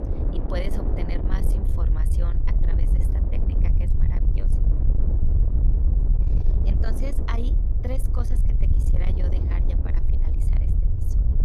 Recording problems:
distortion; slight; 10 dB below the speech
wind noise on the microphone; heavy; 3 dB below the speech
low rumble; loud; throughout; 3 dB below the speech

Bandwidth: 13.5 kHz